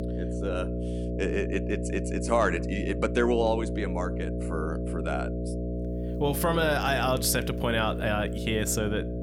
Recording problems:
electrical hum; loud; throughout; 60 Hz, 9 dB below the speech

